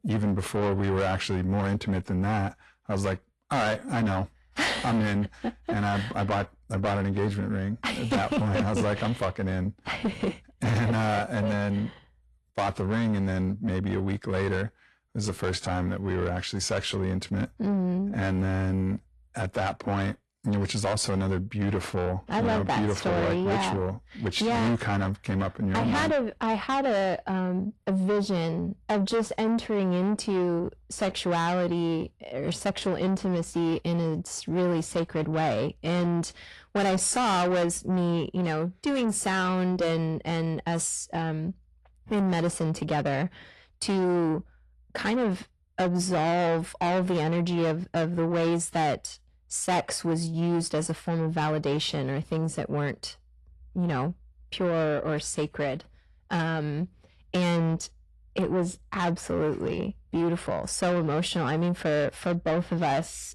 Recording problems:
distortion; heavy; 7 dB below the speech
garbled, watery; slightly

